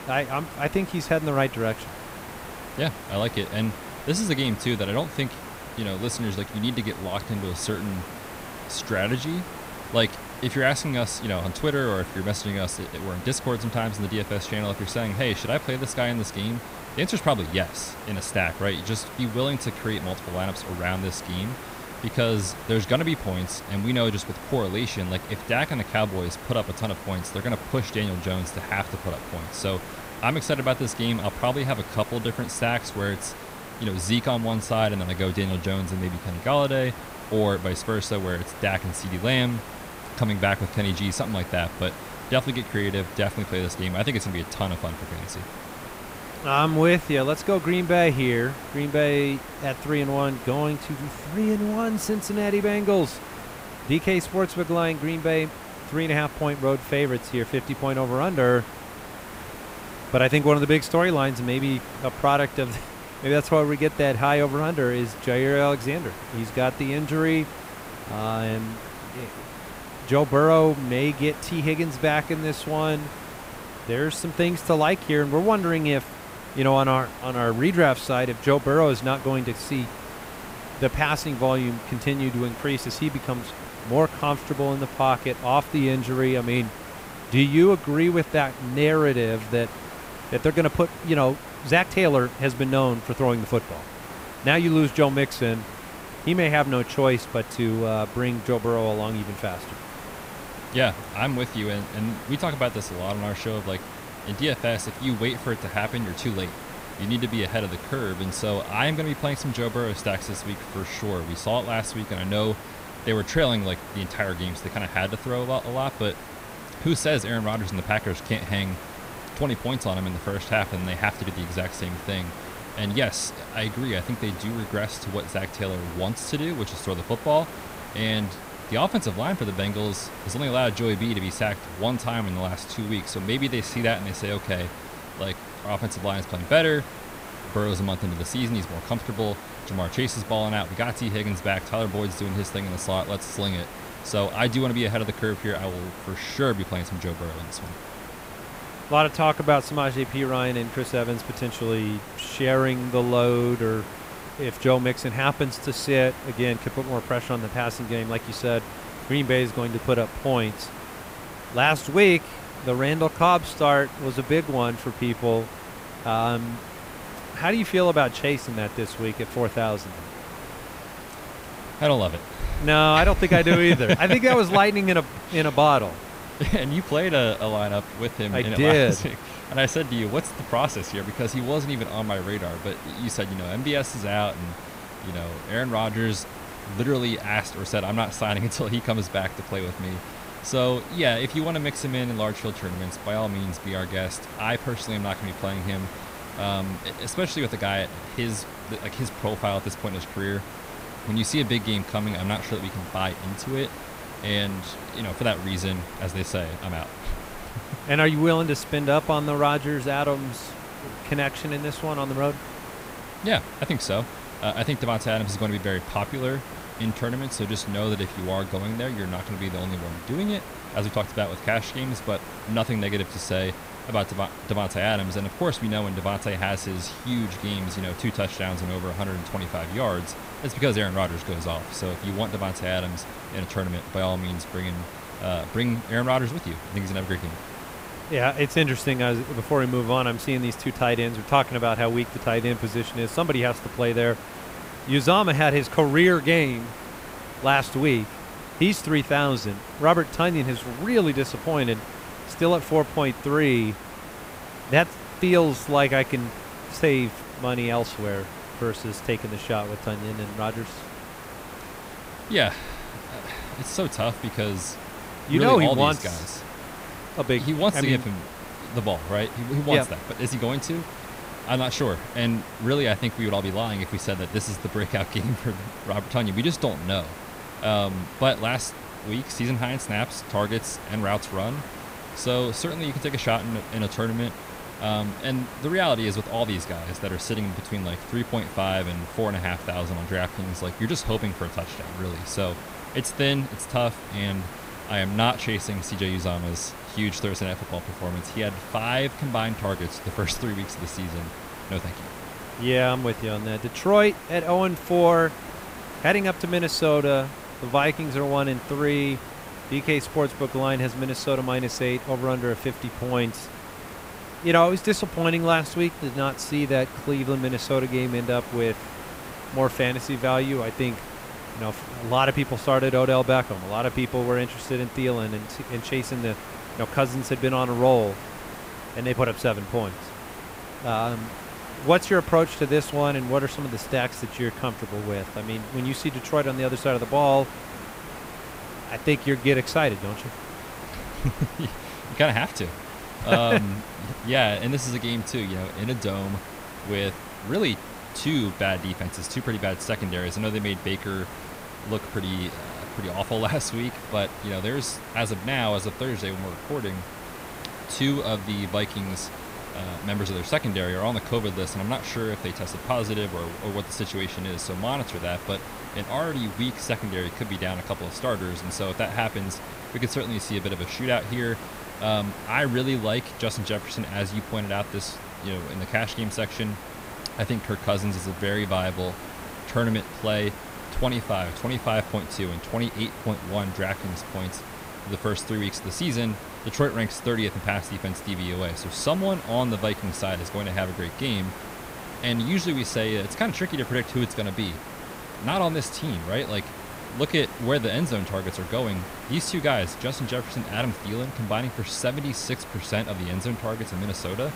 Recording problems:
hiss; noticeable; throughout; 10 dB below the speech

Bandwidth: 15.5 kHz